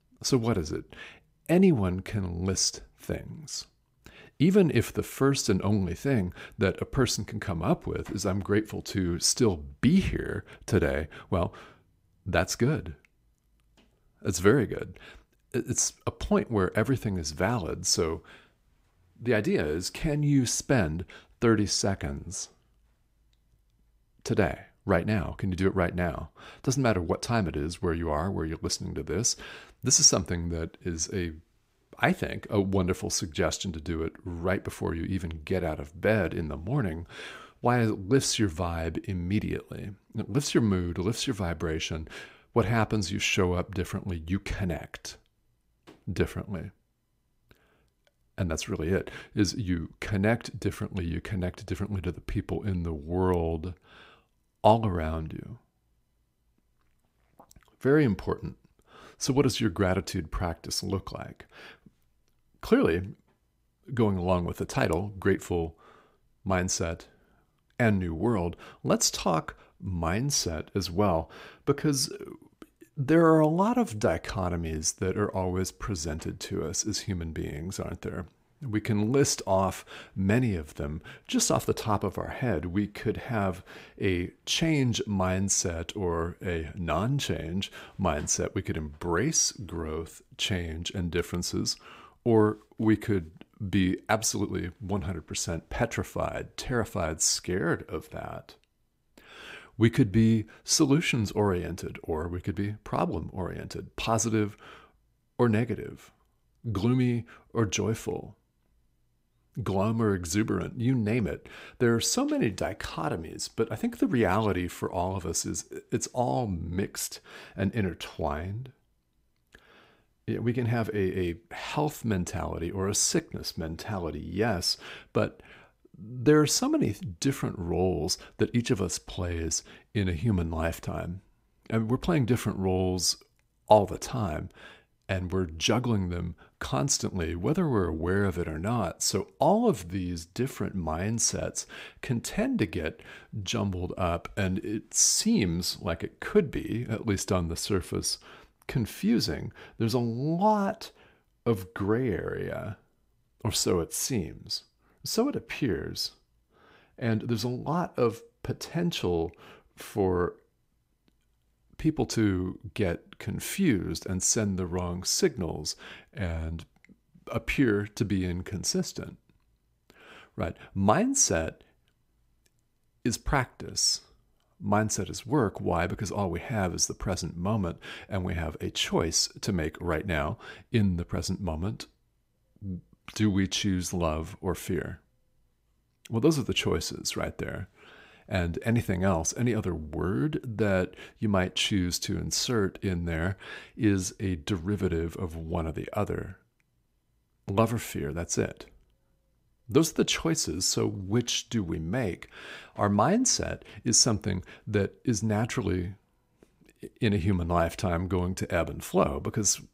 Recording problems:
none

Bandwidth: 15.5 kHz